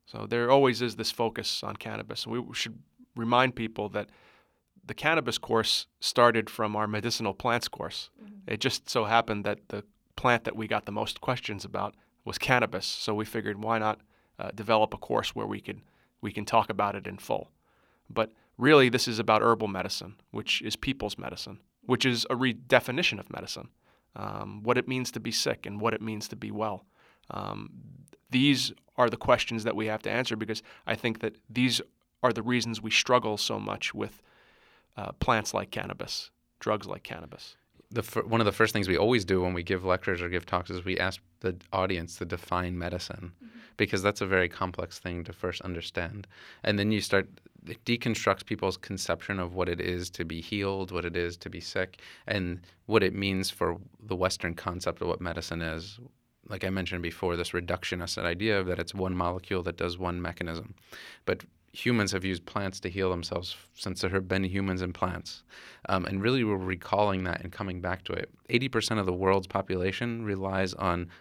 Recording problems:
none

